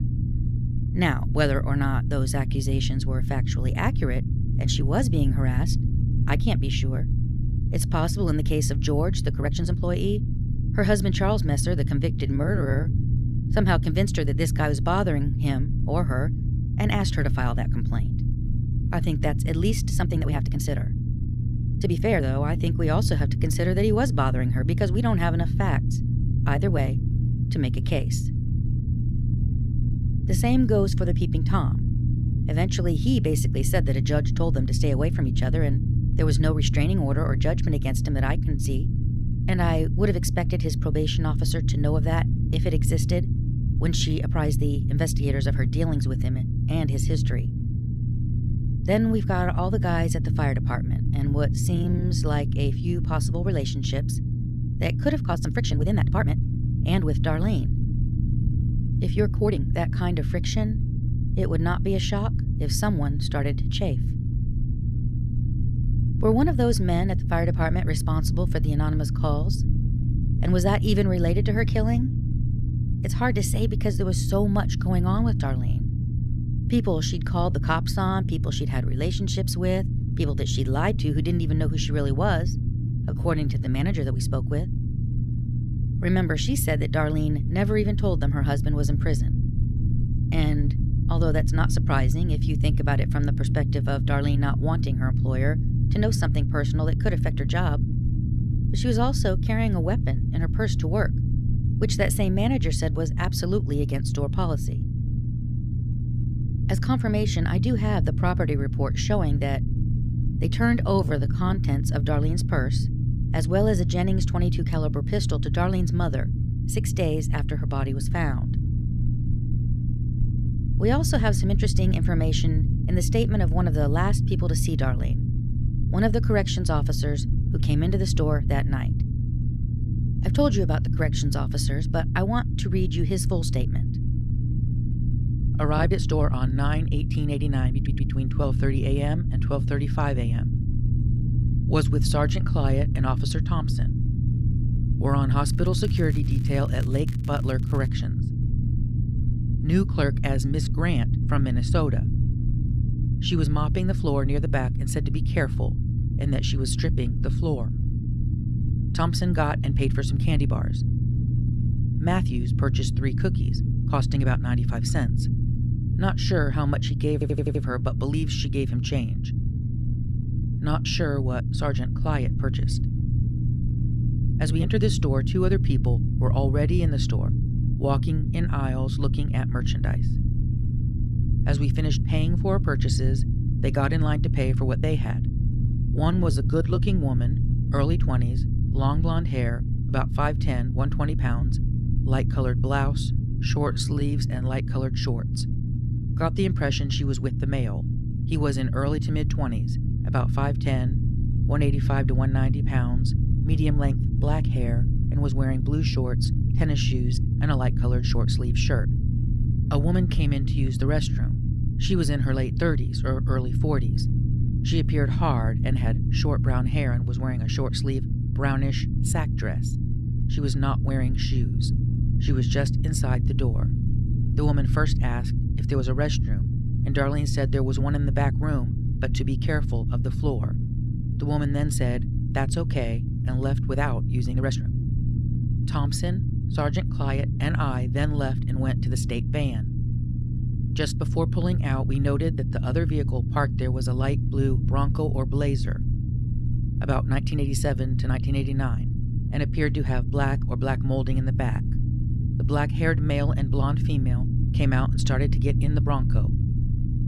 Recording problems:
low rumble; loud; throughout; 7 dB below the speech
crackling; faint; from 2:25 to 2:28; 25 dB below the speech
uneven, jittery; strongly; from 9.5 s to 3:55
audio stuttering; at 2:18 and at 2:47

